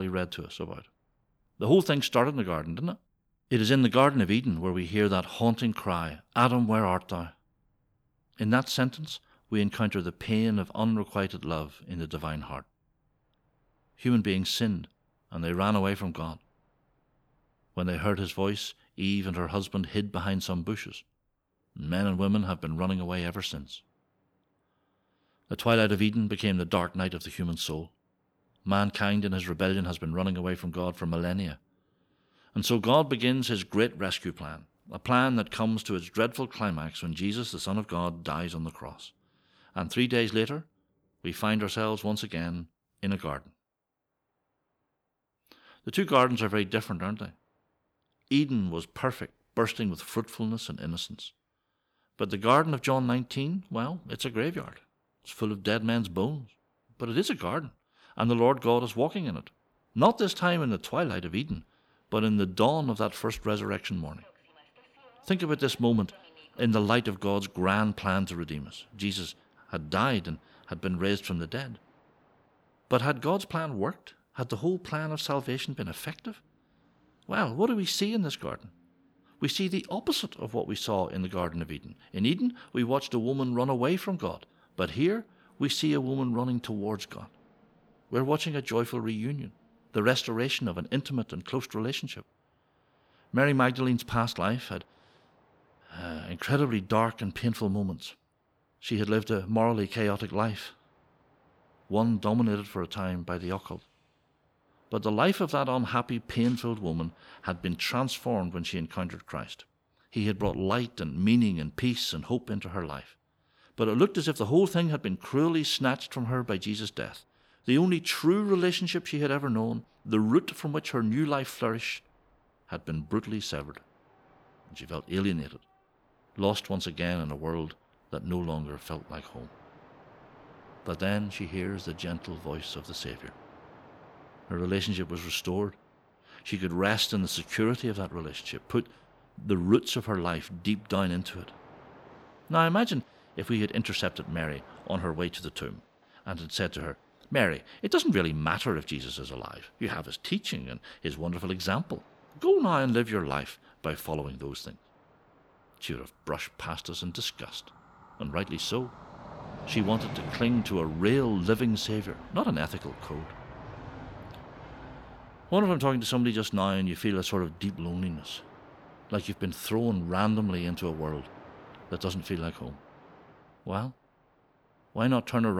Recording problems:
train or aircraft noise; faint; throughout; 25 dB below the speech
abrupt cut into speech; at the start and the end

